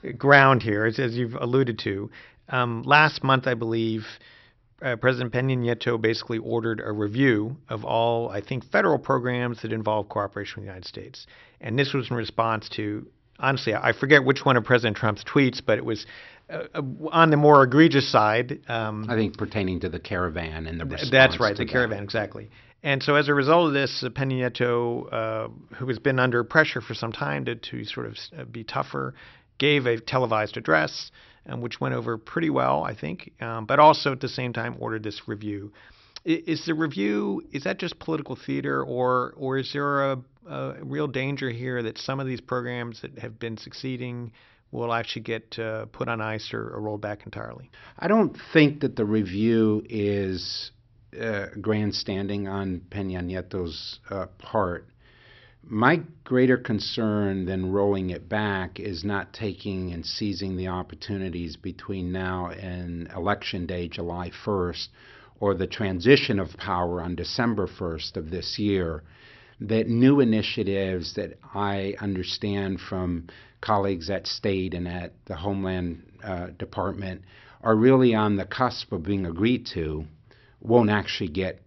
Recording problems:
high frequencies cut off; noticeable; nothing above 5.5 kHz

